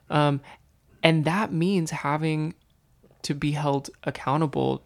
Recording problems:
none

